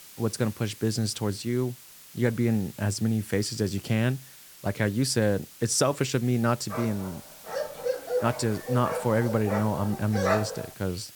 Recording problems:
hiss; noticeable; throughout; 20 dB below the speech
dog barking; loud; from 6.5 to 11 s; peak 1 dB above the speech

